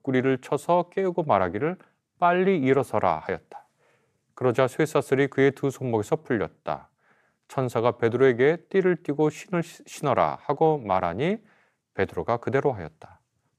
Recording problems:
none

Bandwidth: 14.5 kHz